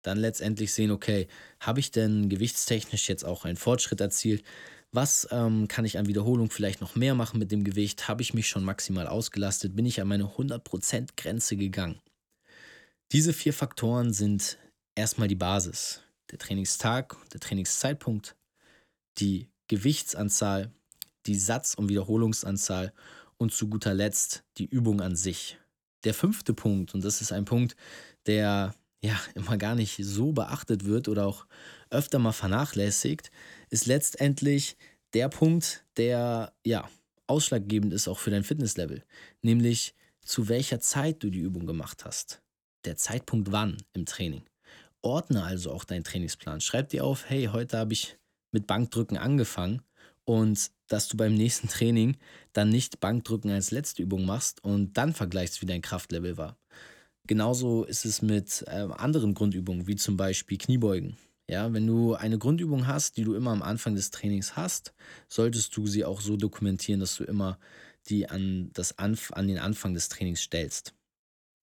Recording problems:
none

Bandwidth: 18.5 kHz